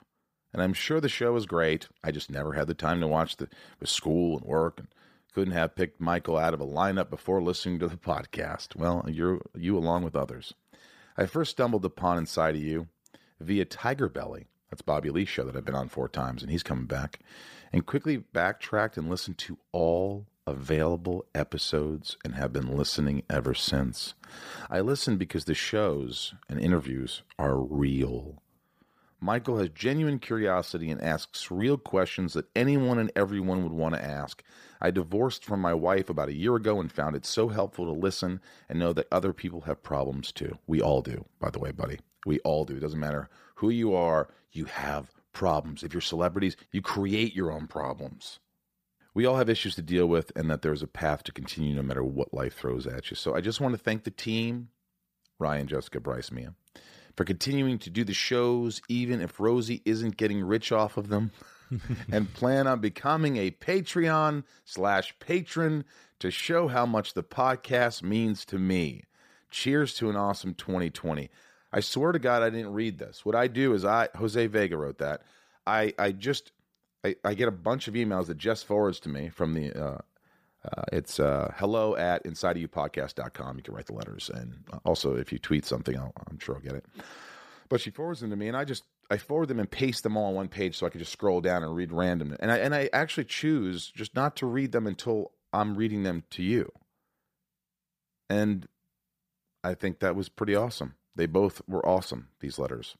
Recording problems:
none

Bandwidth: 15 kHz